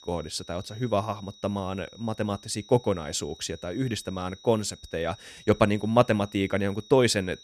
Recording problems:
high-pitched whine; faint; throughout; 4 kHz, 20 dB below the speech

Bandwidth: 14 kHz